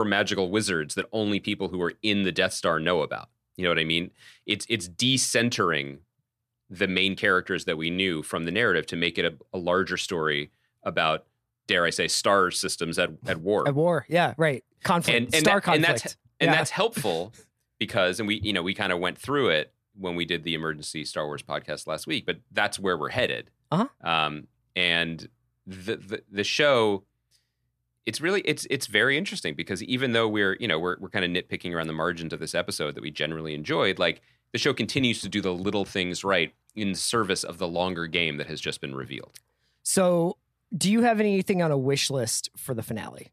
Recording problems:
abrupt cut into speech; at the start

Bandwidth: 14.5 kHz